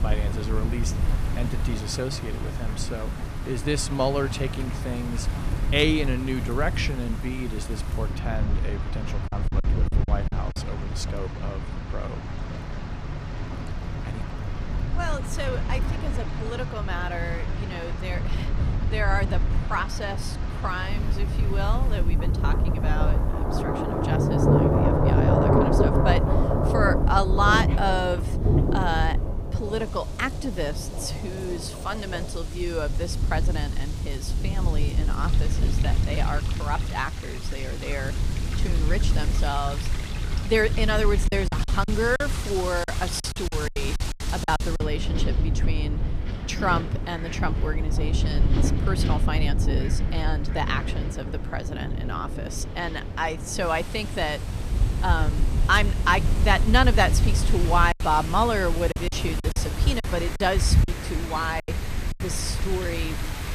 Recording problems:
rain or running water; loud; throughout; 2 dB below the speech
wind in the background; loud; throughout; 5 dB below the speech
wind noise on the microphone; occasional gusts; 15 dB below the speech
choppy; very; from 9.5 to 11 s, from 41 to 45 s and from 58 s to 1:02; 12% of the speech affected

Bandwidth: 15 kHz